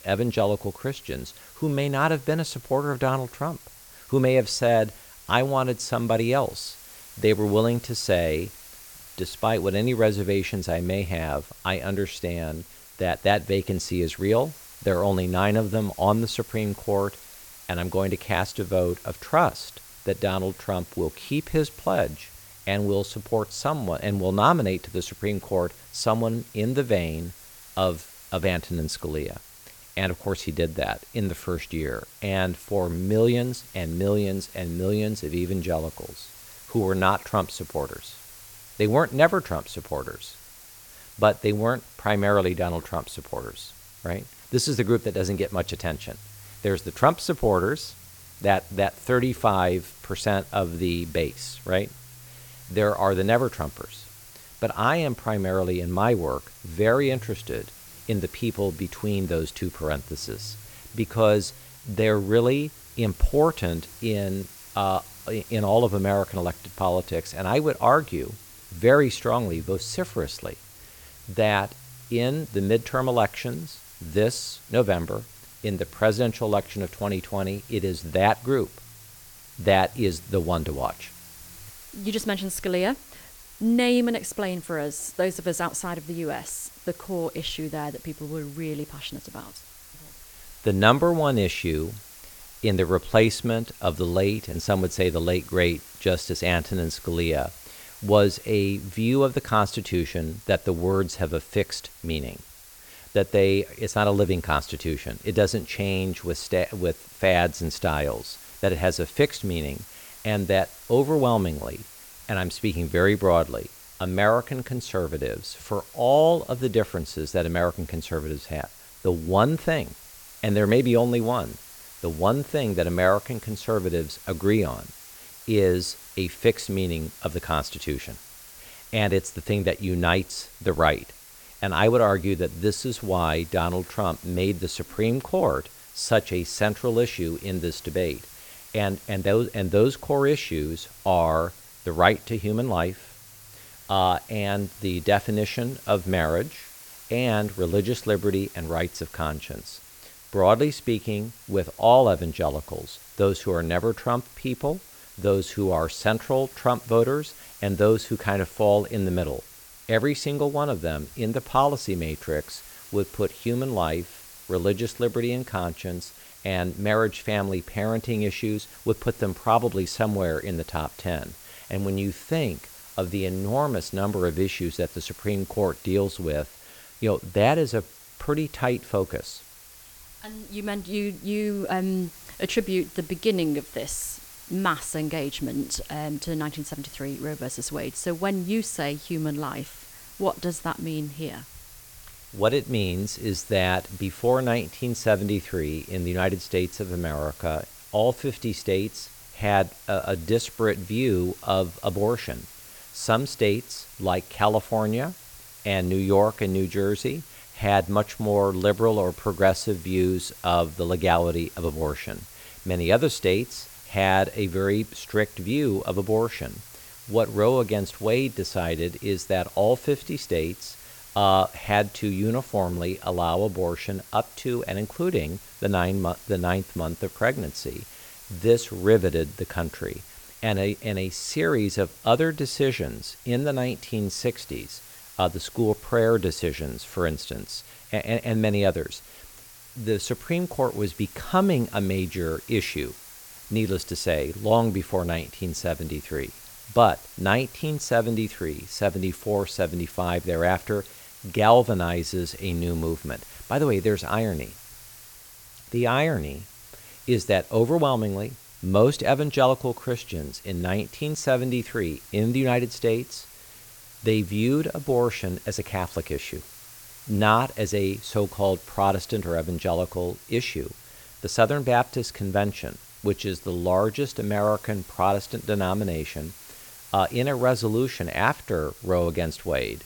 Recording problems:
hiss; noticeable; throughout; 20 dB below the speech

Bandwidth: 18 kHz